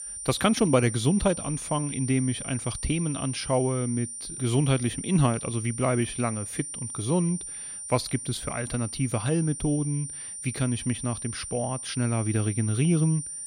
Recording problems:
high-pitched whine; loud; throughout; 9 kHz, 7 dB below the speech

